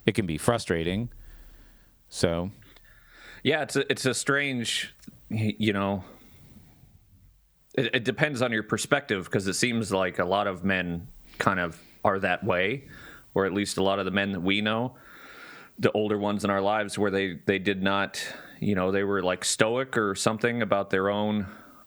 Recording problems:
squashed, flat; somewhat

